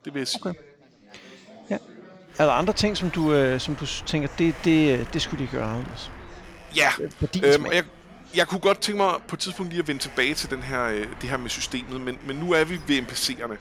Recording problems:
wind noise on the microphone; occasional gusts; from 2.5 s on; 20 dB below the speech
chatter from many people; faint; throughout; 25 dB below the speech

